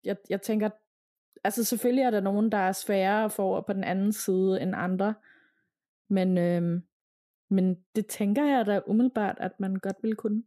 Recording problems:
none

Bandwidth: 14.5 kHz